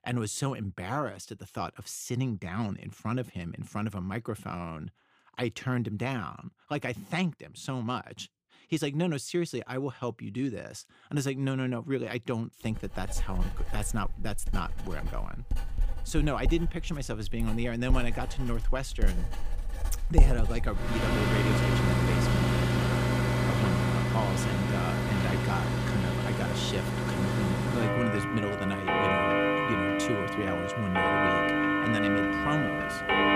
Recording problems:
household noises; very loud; from 13 s on; 5 dB above the speech

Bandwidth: 15 kHz